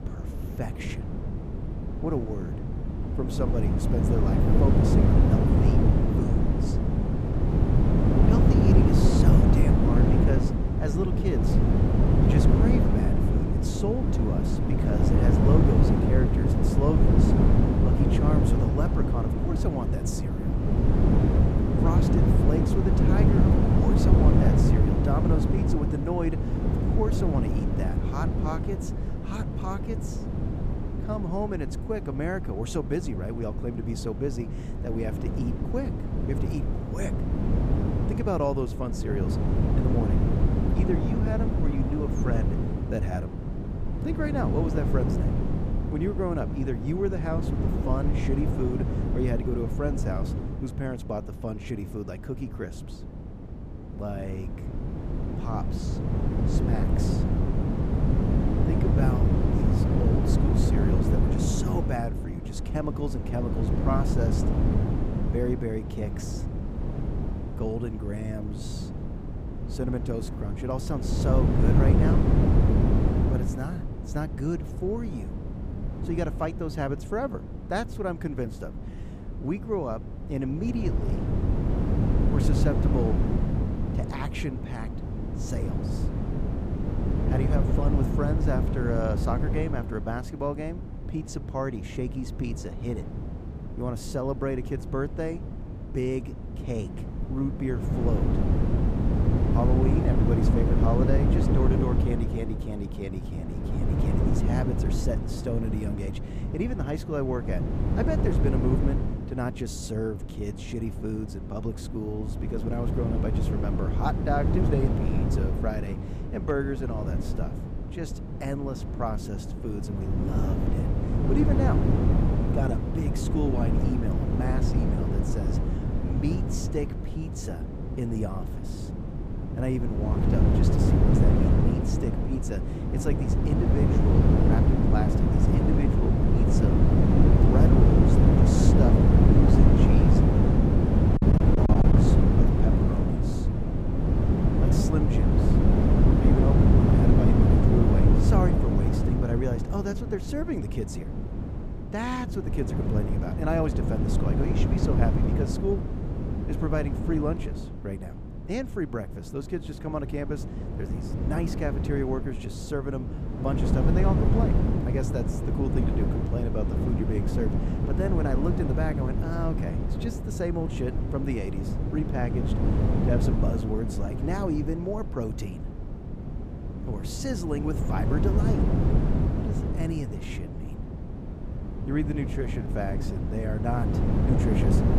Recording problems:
wind noise on the microphone; heavy; 1 dB above the speech
choppy; very; at 2:21; 12% of the speech affected

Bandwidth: 15 kHz